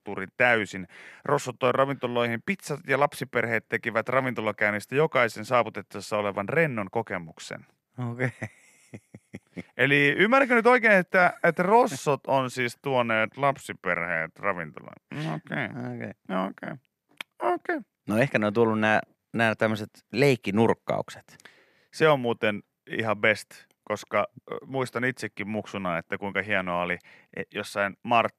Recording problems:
none

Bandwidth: 13.5 kHz